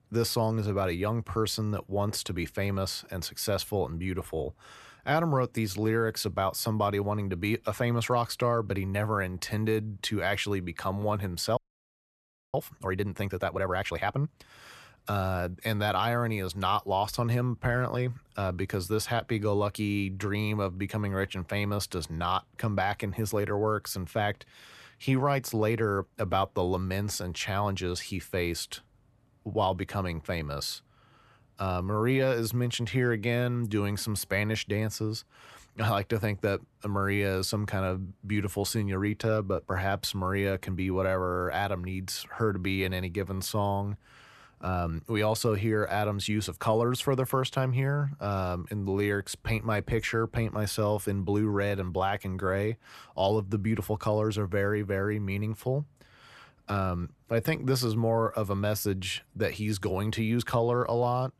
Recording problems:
audio freezing; at 12 s for 1 s

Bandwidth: 13.5 kHz